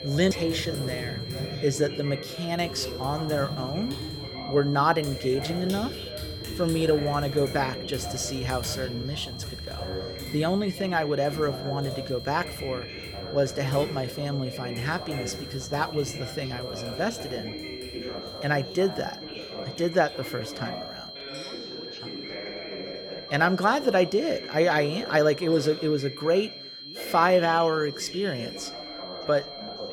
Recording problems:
high-pitched whine; noticeable; throughout; 4 kHz, 10 dB below the speech
household noises; noticeable; throughout; 15 dB below the speech
background chatter; noticeable; throughout; 3 voices, 10 dB below the speech

